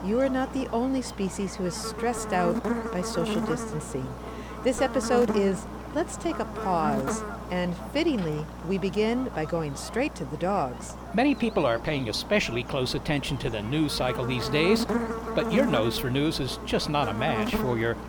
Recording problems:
electrical hum; loud; throughout; 60 Hz, 6 dB below the speech

